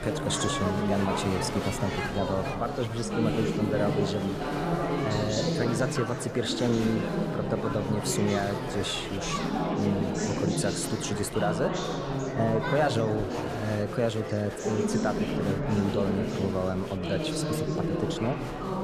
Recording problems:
echo of what is said; noticeable; throughout; 280 ms later, 15 dB below the speech
chatter from many people; loud; throughout; as loud as the speech

